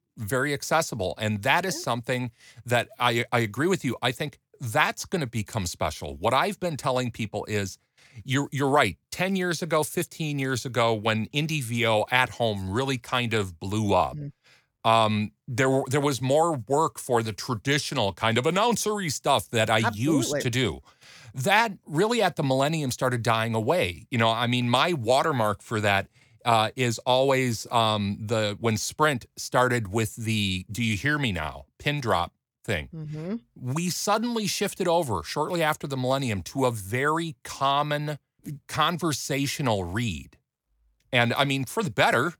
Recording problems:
none

